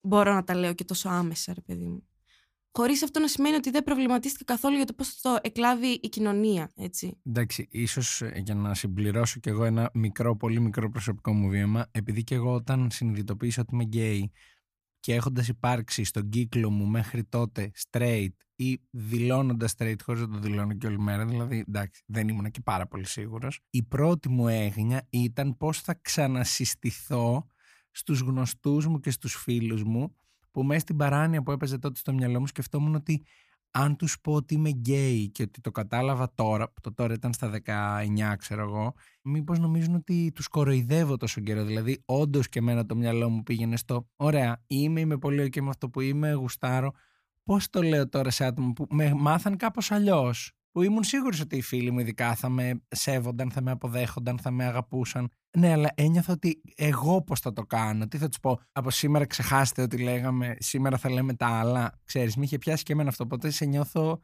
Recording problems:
none

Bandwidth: 15 kHz